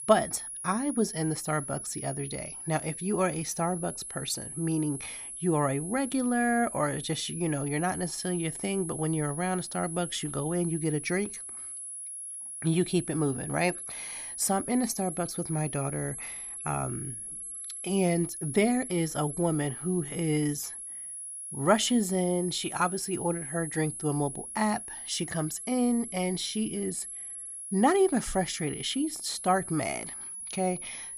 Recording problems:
high-pitched whine; loud; throughout; 10.5 kHz, 7 dB below the speech

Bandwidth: 15 kHz